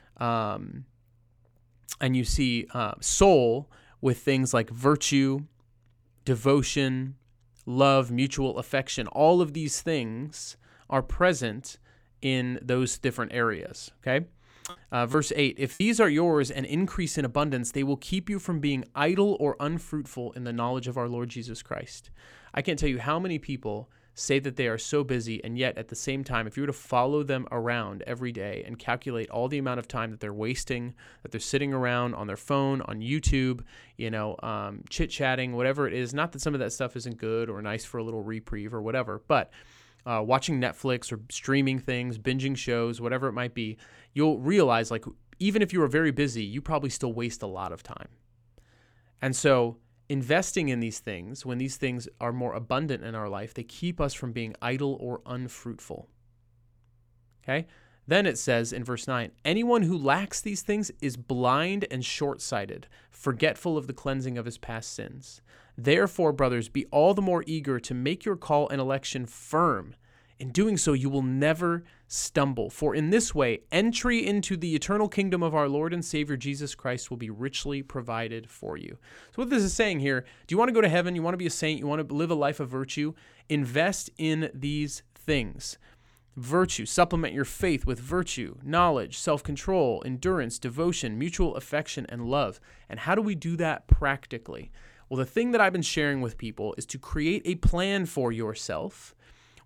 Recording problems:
choppy; occasionally; from 14 to 16 s; 4% of the speech affected

